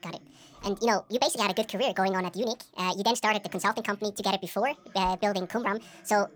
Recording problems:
wrong speed and pitch; too fast and too high; 1.6 times normal speed
voice in the background; faint; throughout; 30 dB below the speech

